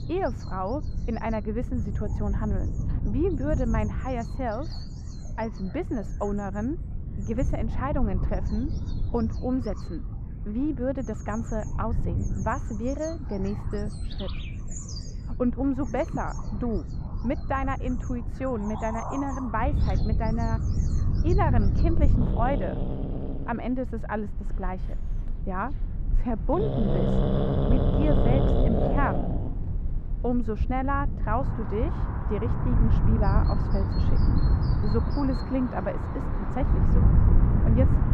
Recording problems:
muffled; very; fading above 3 kHz
animal sounds; loud; throughout; 2 dB below the speech
wind noise on the microphone; occasional gusts; 10 dB below the speech

